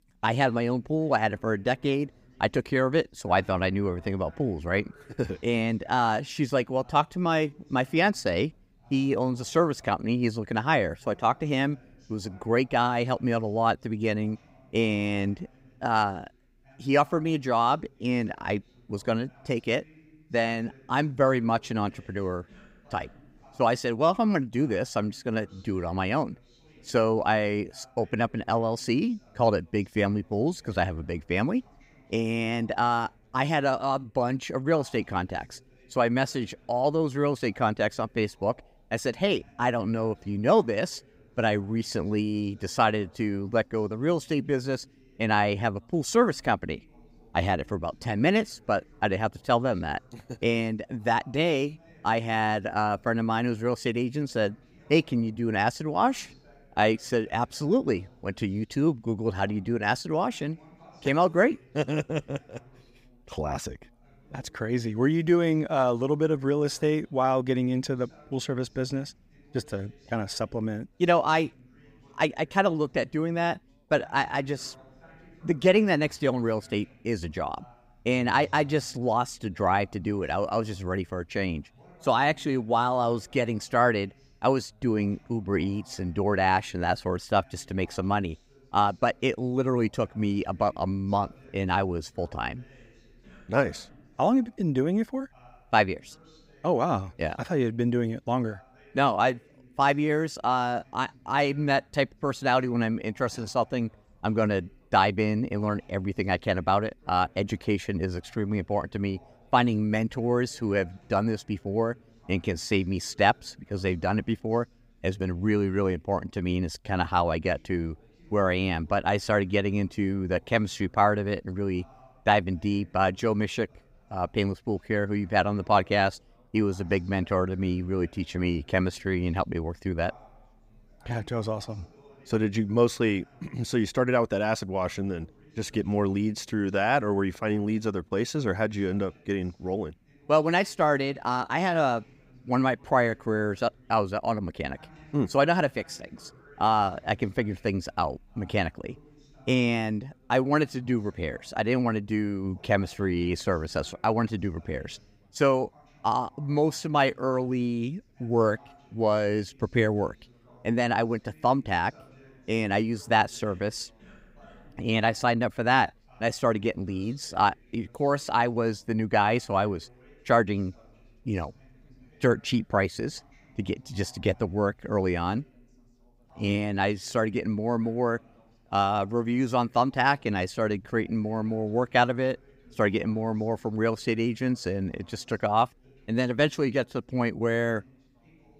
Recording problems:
background chatter; faint; throughout; 3 voices, 30 dB below the speech

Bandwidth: 15.5 kHz